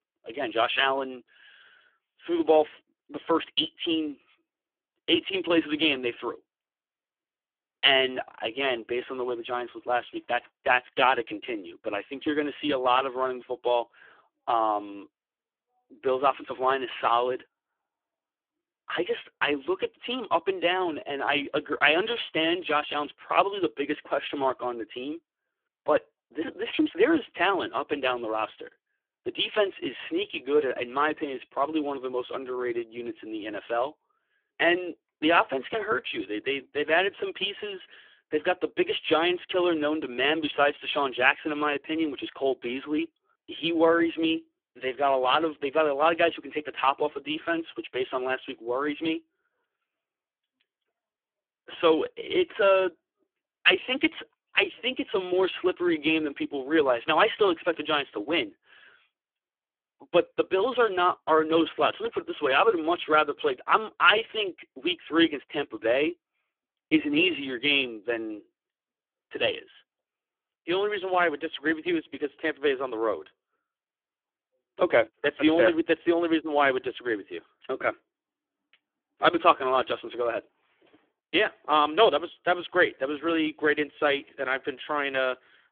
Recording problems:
phone-call audio; poor line; nothing above 3.5 kHz

